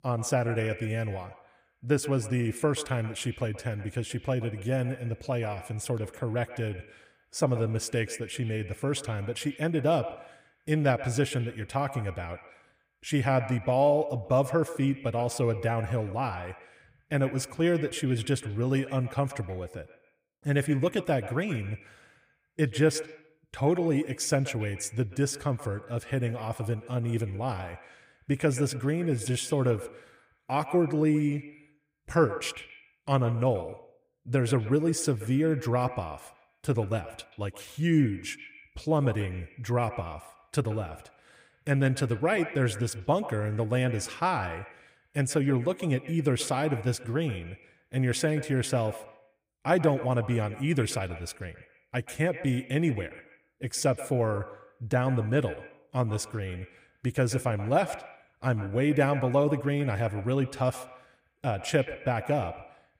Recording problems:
echo of what is said; noticeable; throughout; 130 ms later, 15 dB below the speech

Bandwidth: 15.5 kHz